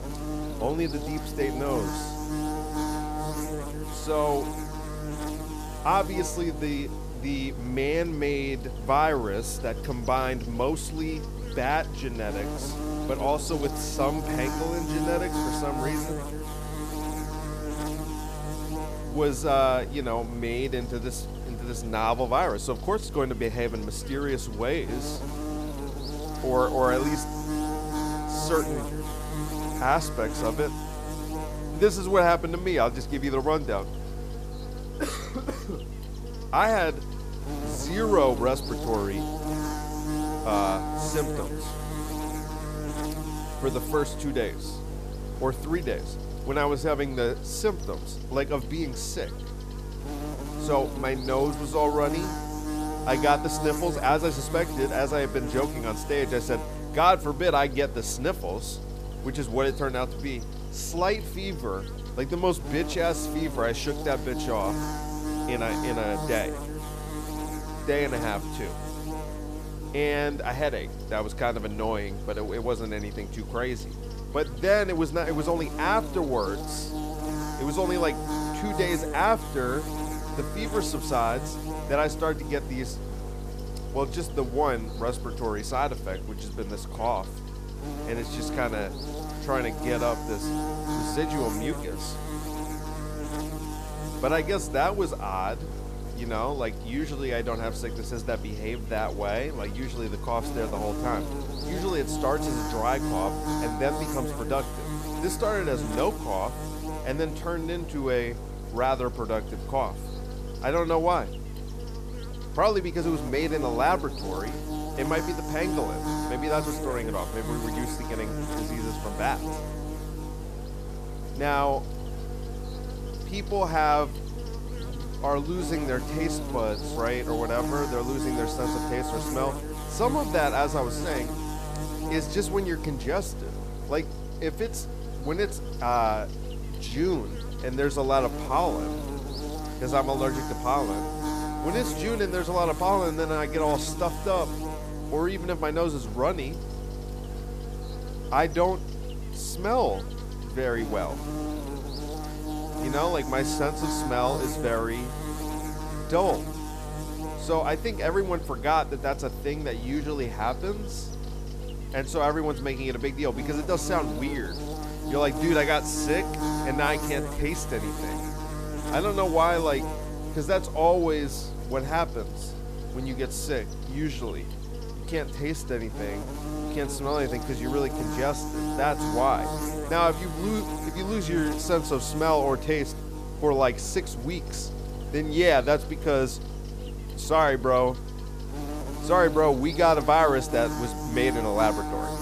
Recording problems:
electrical hum; loud; throughout; 50 Hz, 9 dB below the speech

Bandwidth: 14.5 kHz